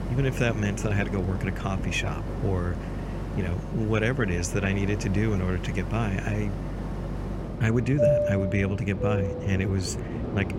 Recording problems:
train or aircraft noise; loud; throughout; 4 dB below the speech

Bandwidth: 16 kHz